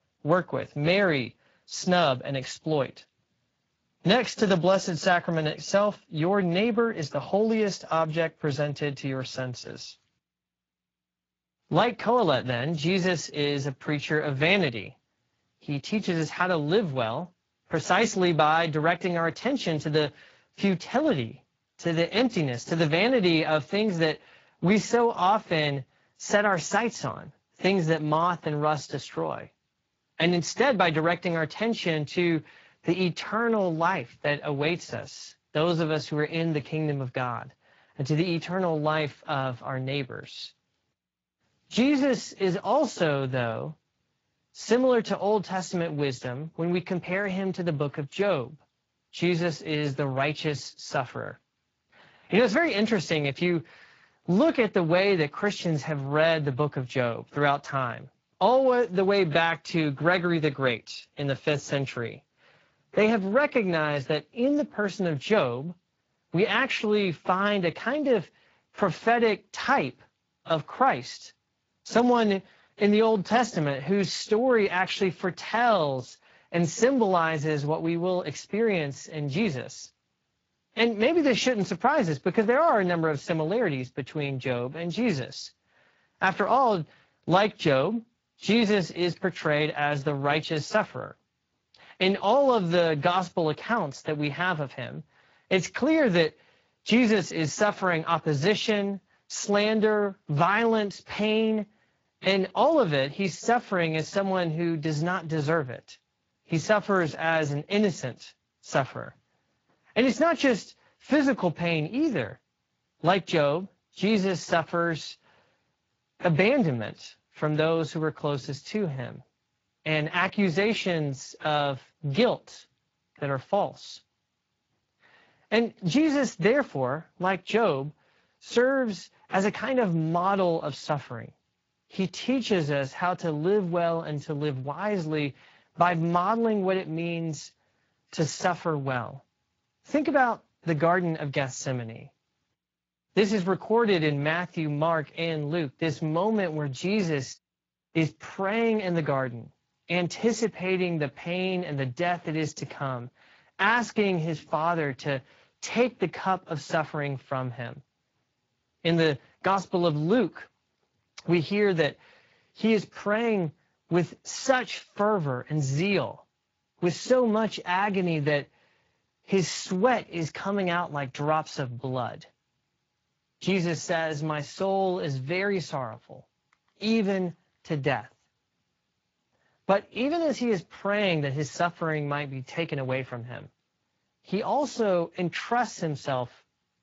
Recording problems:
garbled, watery; slightly; nothing above 7.5 kHz

